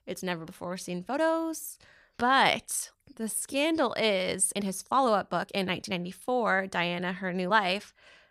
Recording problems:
uneven, jittery; strongly; from 0.5 to 7.5 s

